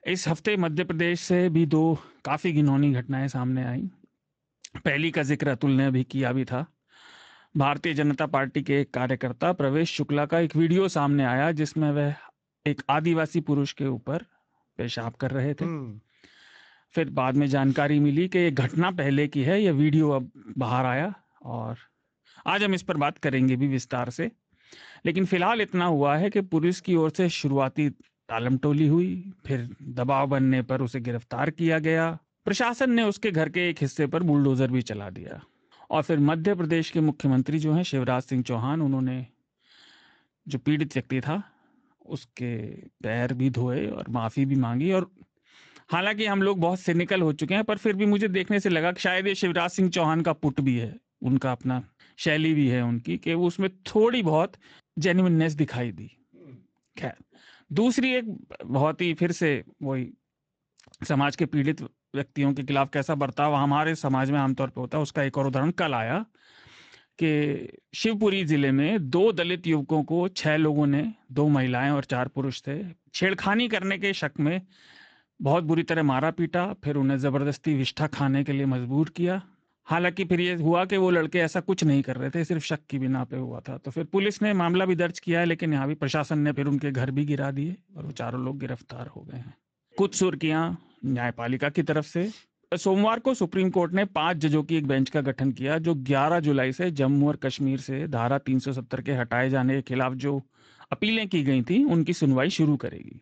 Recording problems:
garbled, watery; slightly; nothing above 7.5 kHz

